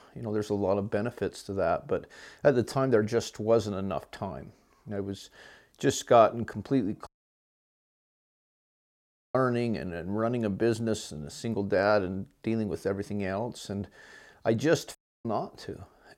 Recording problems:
audio cutting out; at 7 s for 2.5 s and at 15 s

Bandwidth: 16 kHz